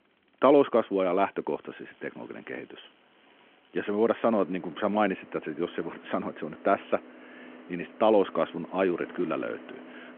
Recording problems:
phone-call audio
traffic noise; faint; throughout; 20 dB below the speech

